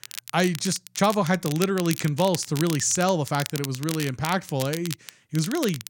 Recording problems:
crackle, like an old record; noticeable; 10 dB below the speech

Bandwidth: 16.5 kHz